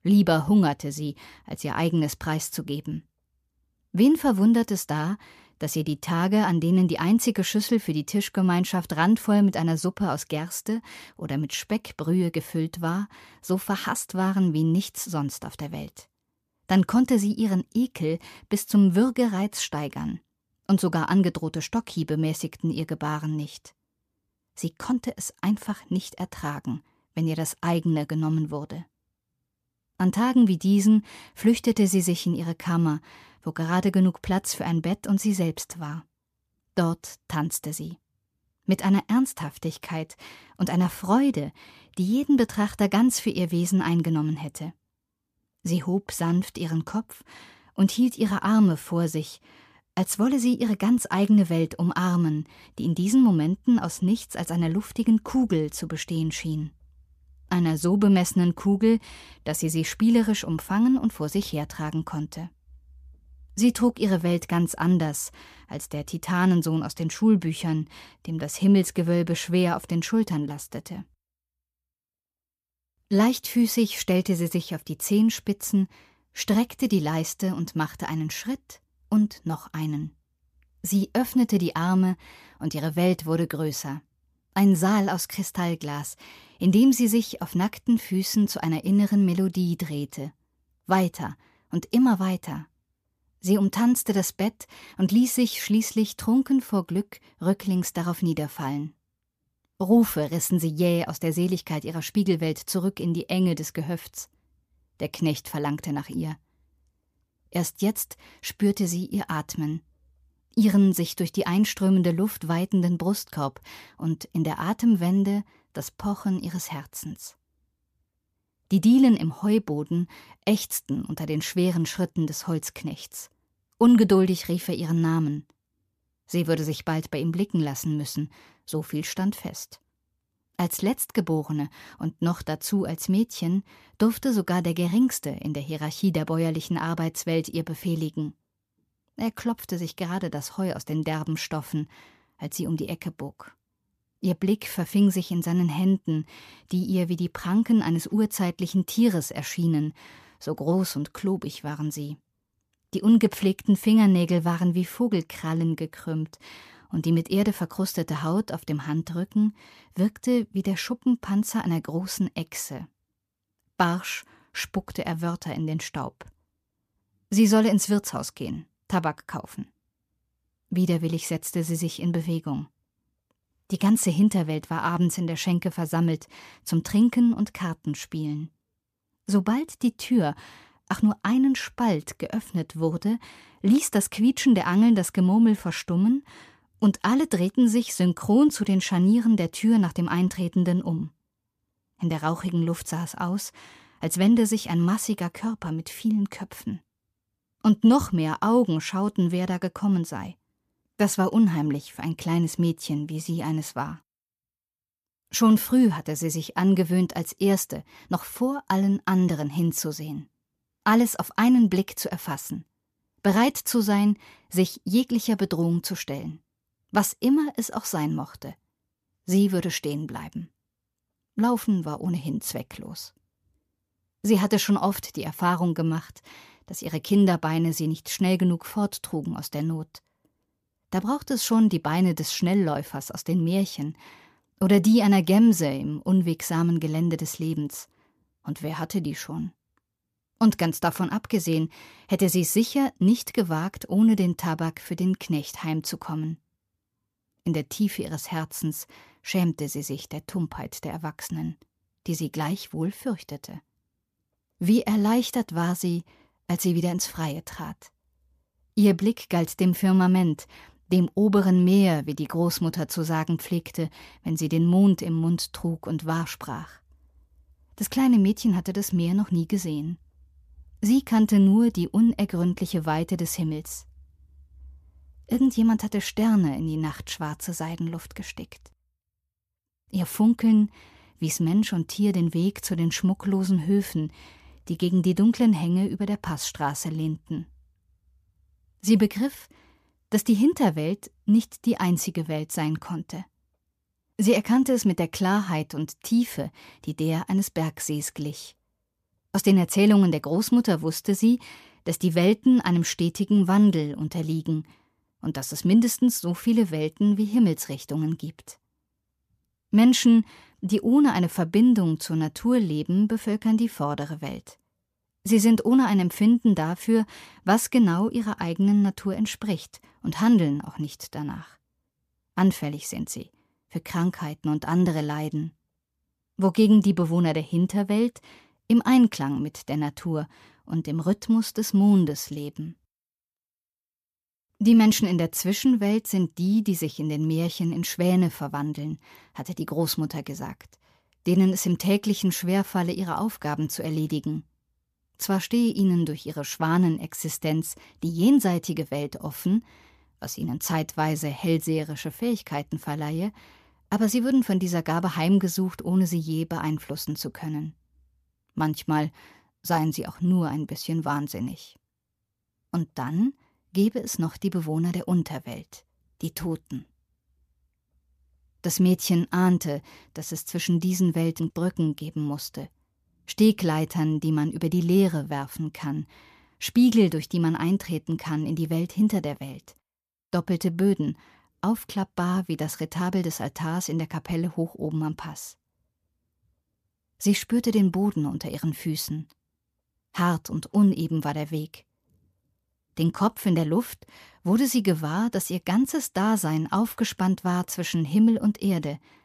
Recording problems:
none

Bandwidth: 14.5 kHz